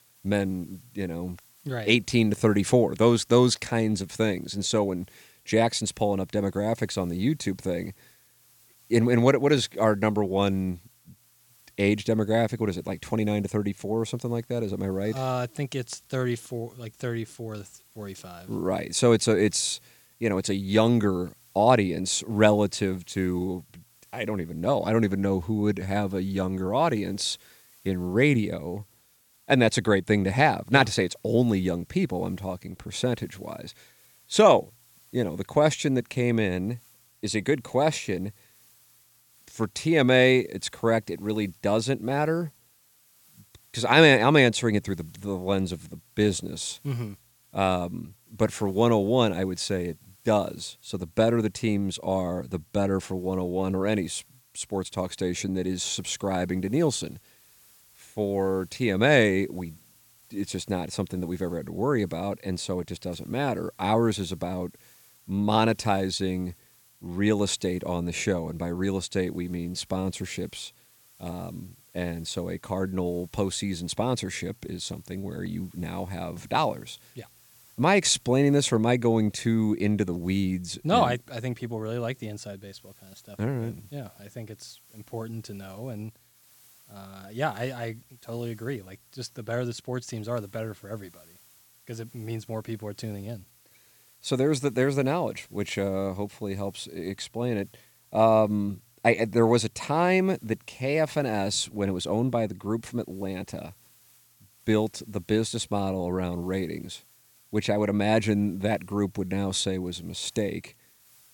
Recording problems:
hiss; faint; throughout; 30 dB below the speech

